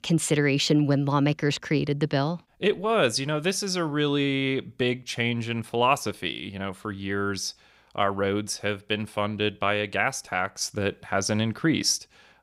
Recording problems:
none

